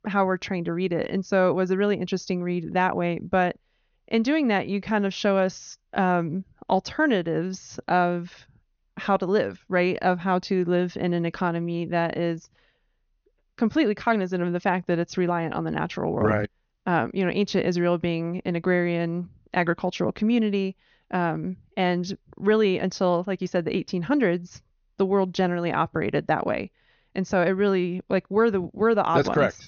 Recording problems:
high frequencies cut off; noticeable; nothing above 6.5 kHz

